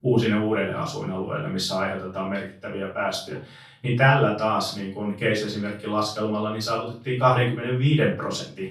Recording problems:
off-mic speech; far
room echo; noticeable; dies away in 0.3 s

